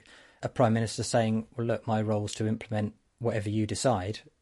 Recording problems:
garbled, watery; slightly; nothing above 11 kHz

